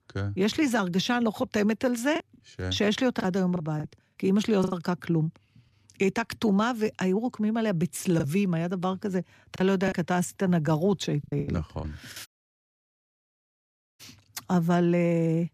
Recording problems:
choppy; very; from 2 to 4.5 s, from 8 to 10 s and at 11 s; 11% of the speech affected
audio cutting out; at 12 s for 1.5 s

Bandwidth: 14.5 kHz